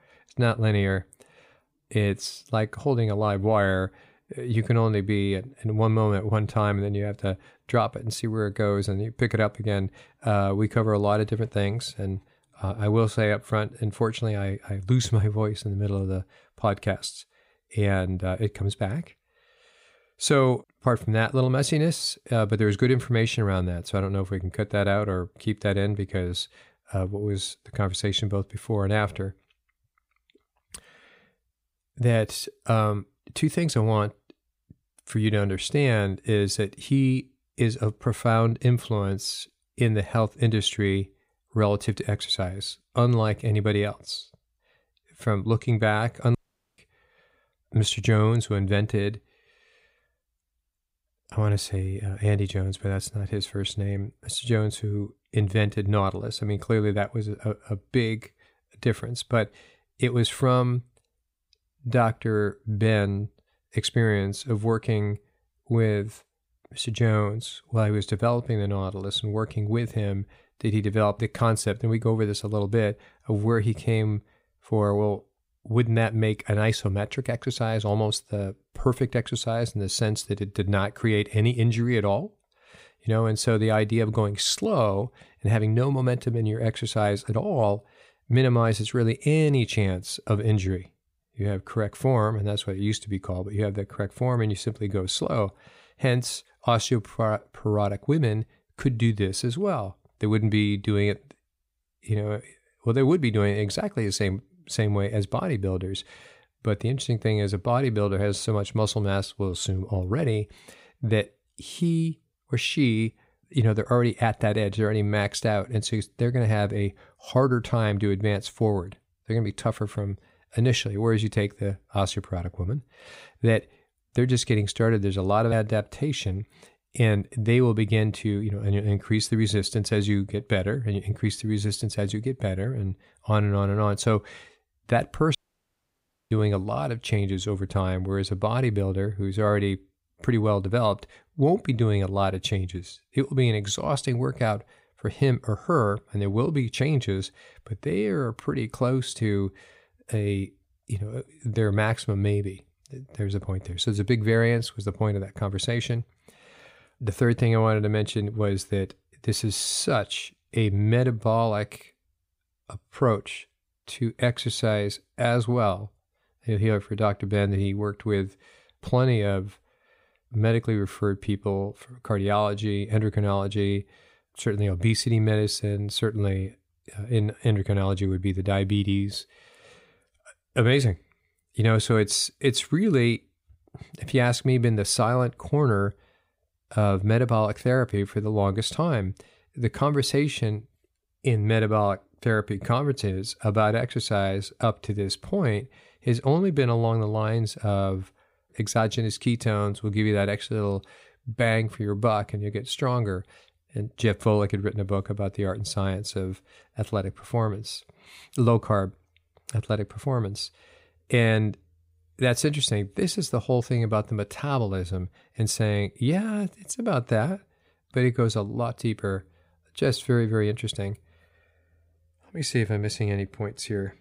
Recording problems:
audio cutting out; at 46 s and at 2:15 for 1 s

